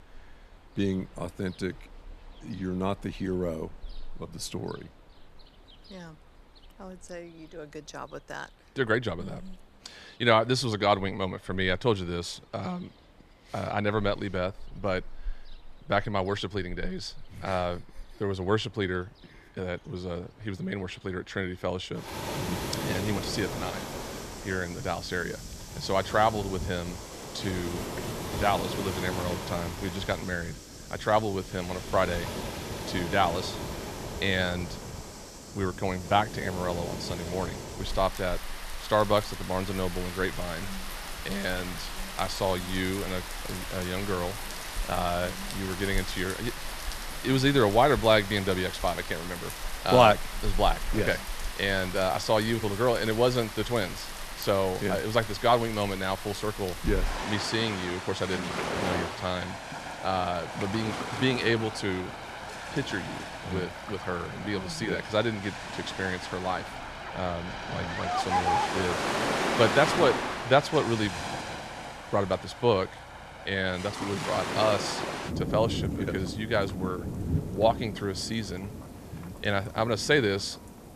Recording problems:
rain or running water; loud; throughout; 6 dB below the speech

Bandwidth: 14.5 kHz